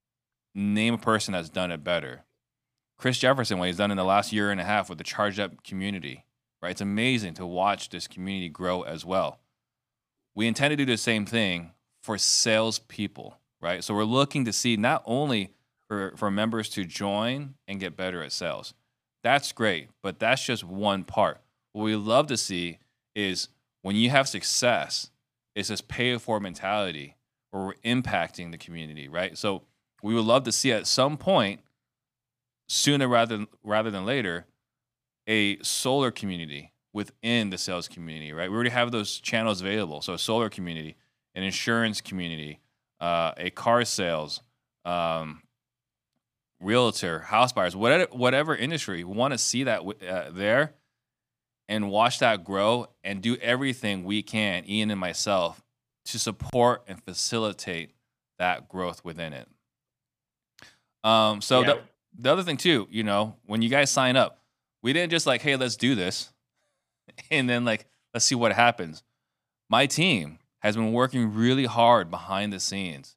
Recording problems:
none

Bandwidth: 15 kHz